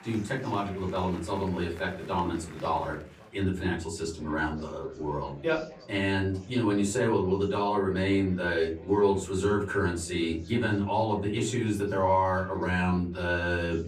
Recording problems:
off-mic speech; far
room echo; very slight; dies away in 0.3 s
chatter from many people; faint; throughout; 20 dB below the speech

